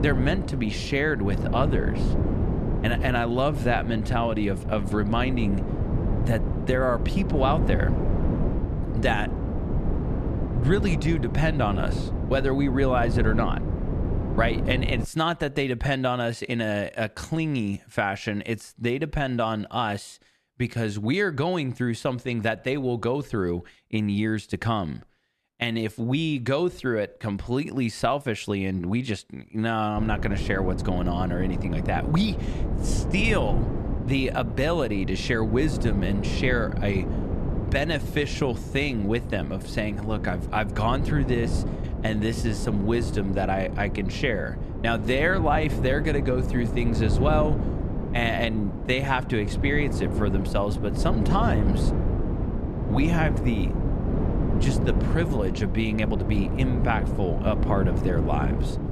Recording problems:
wind noise on the microphone; heavy; until 15 s and from 30 s on; 8 dB below the speech

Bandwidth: 13.5 kHz